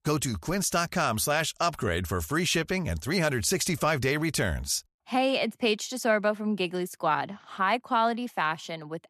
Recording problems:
none

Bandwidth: 14 kHz